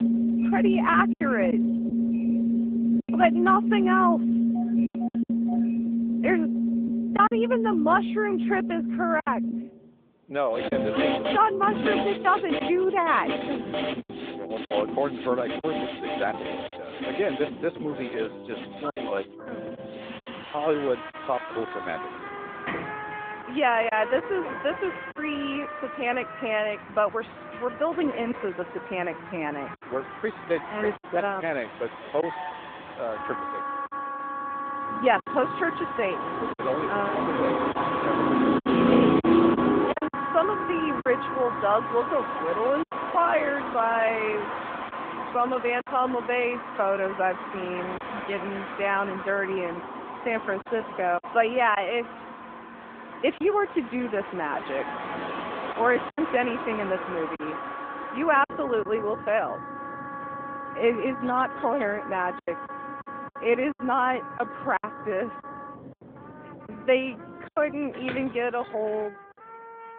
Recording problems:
phone-call audio
background music; loud; throughout; 3 dB below the speech
traffic noise; loud; throughout; 5 dB below the speech
choppy; occasionally; 3% of the speech affected

